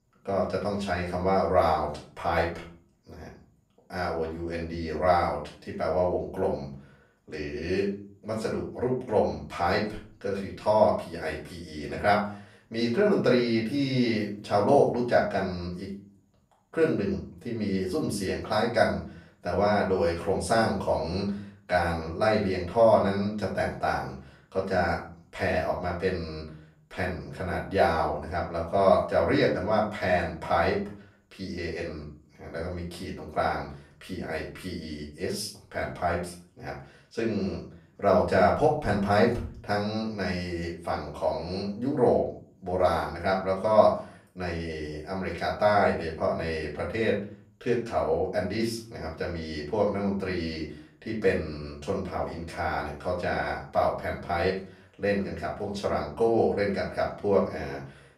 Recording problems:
off-mic speech; far
room echo; slight; dies away in 0.4 s

